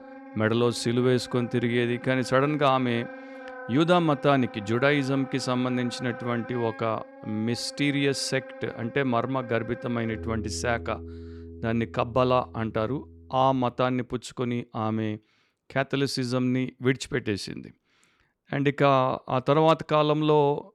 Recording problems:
background music; noticeable; until 14 s; 15 dB below the speech

